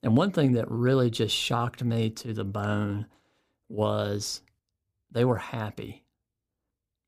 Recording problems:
none

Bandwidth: 15 kHz